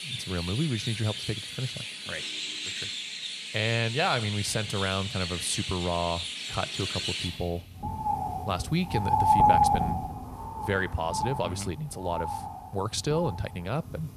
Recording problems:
animal sounds; very loud; throughout; as loud as the speech

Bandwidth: 14.5 kHz